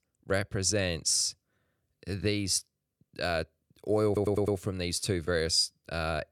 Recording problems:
audio stuttering; at 4 s

